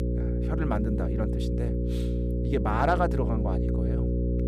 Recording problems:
electrical hum; loud; throughout; 60 Hz, 6 dB below the speech

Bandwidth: 15.5 kHz